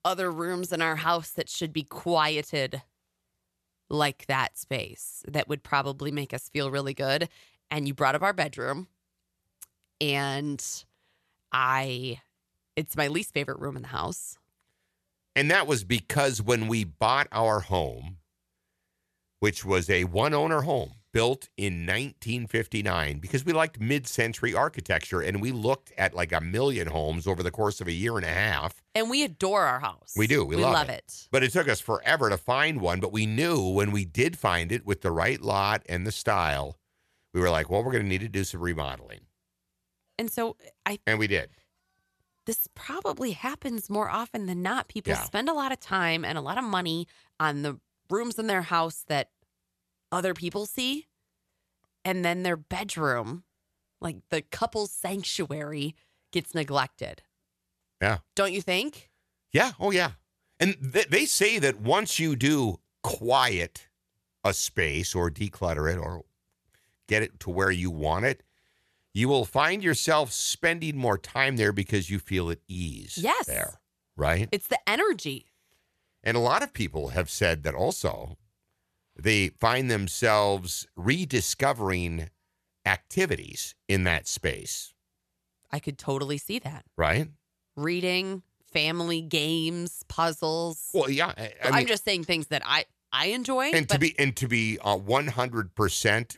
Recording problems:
none

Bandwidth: 13.5 kHz